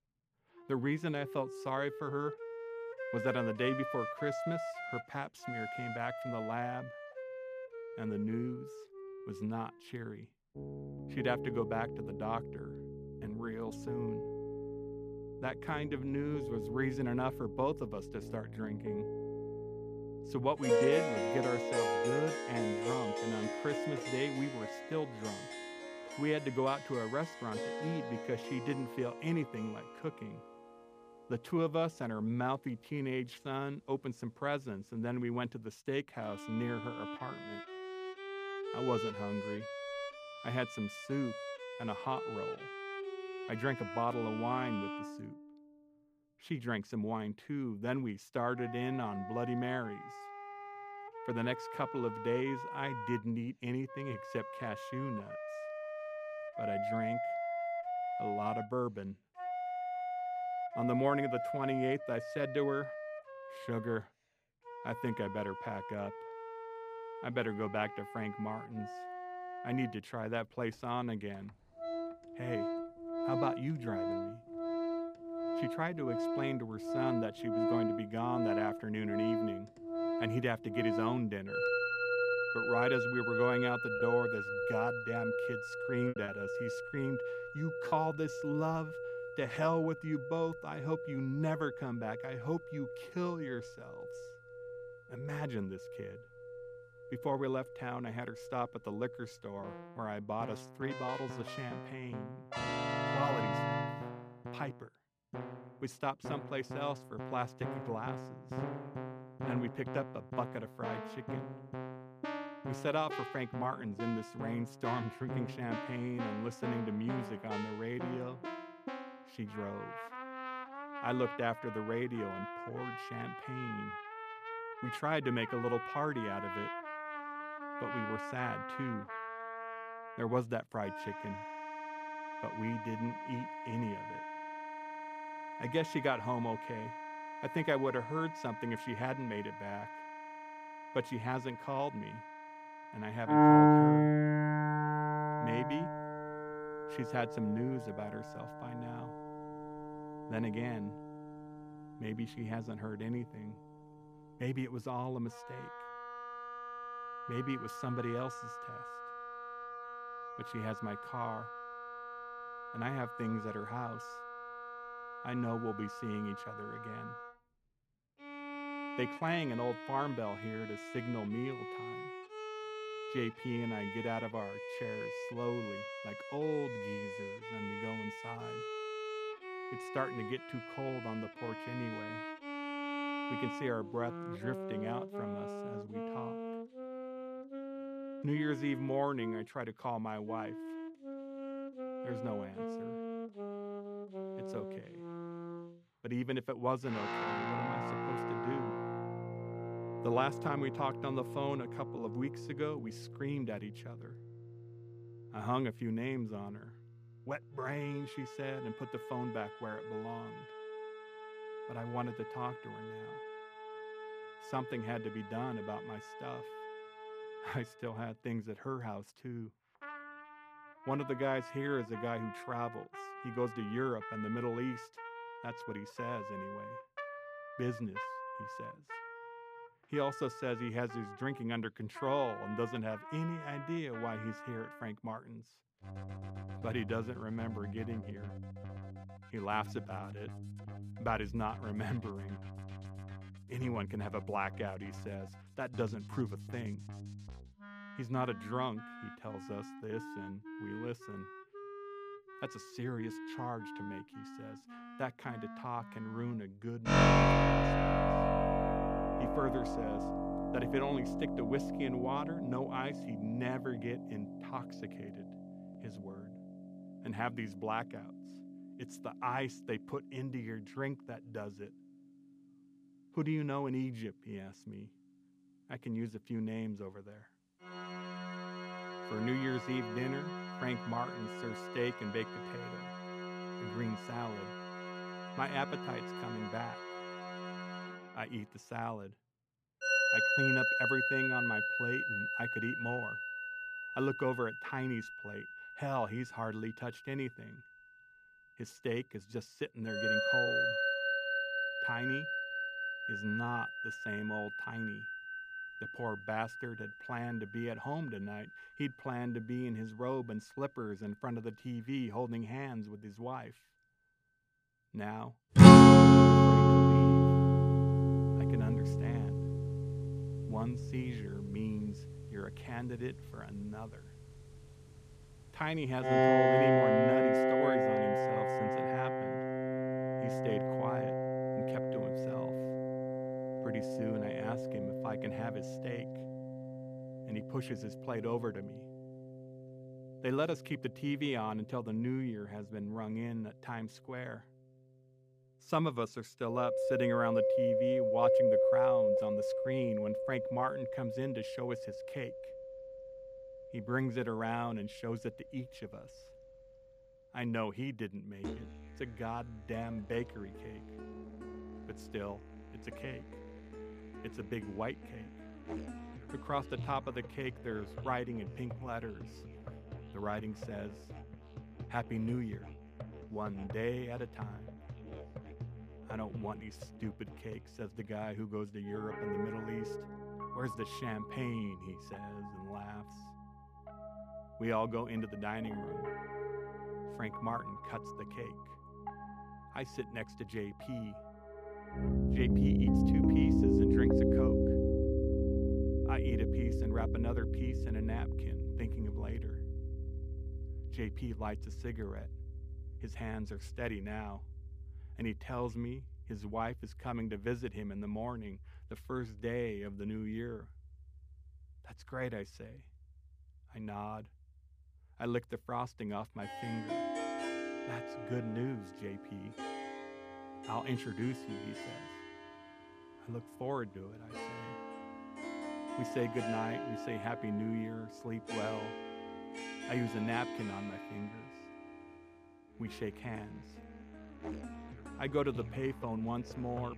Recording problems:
background music; very loud; throughout; 4 dB above the speech
choppy; occasionally; from 1:24 to 1:28; 5% of the speech affected

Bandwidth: 15 kHz